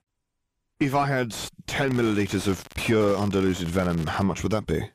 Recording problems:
distortion; slight; 9 dB below the speech
crackling; noticeable; at 2 s and from 3 to 4 s; 20 dB below the speech

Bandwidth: 15 kHz